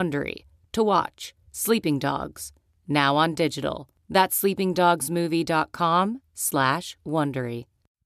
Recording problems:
abrupt cut into speech; at the start

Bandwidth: 14 kHz